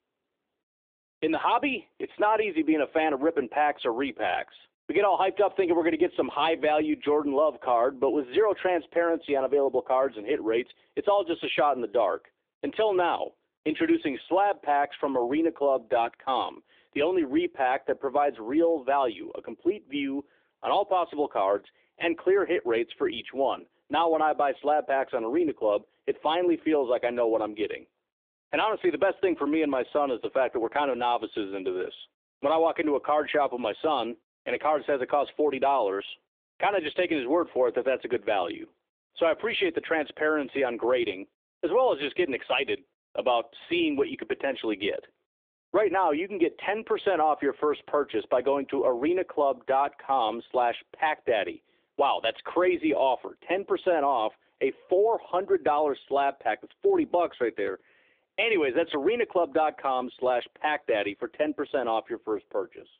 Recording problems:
phone-call audio; nothing above 3.5 kHz

